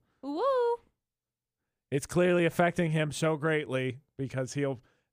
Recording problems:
none

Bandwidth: 15 kHz